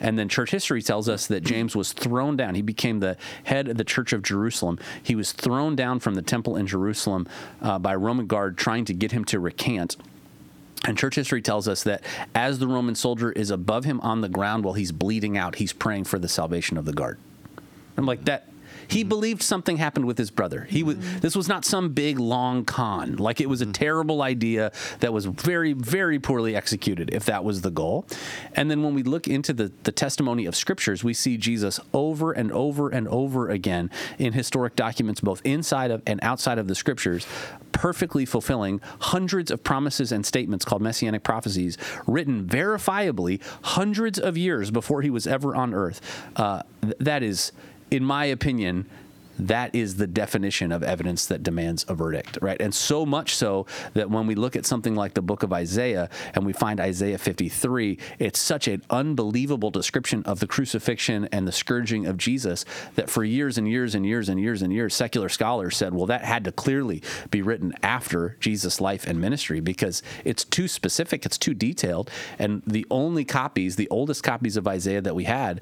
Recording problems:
squashed, flat; somewhat

